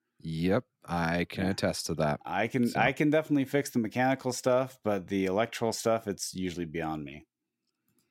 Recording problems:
none

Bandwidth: 16 kHz